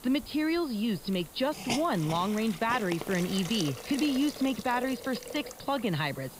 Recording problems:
high frequencies cut off; noticeable; nothing above 5 kHz
hiss; noticeable; throughout; 10 dB below the speech

